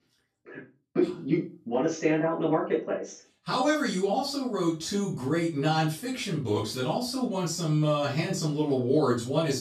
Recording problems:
off-mic speech; far
room echo; slight; dies away in 0.3 s

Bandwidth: 14 kHz